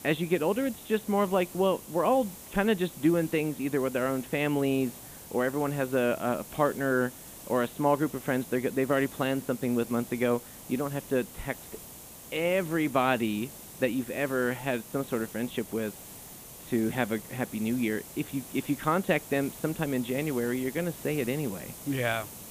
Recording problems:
high frequencies cut off; severe; nothing above 4 kHz
hiss; noticeable; throughout; 15 dB below the speech

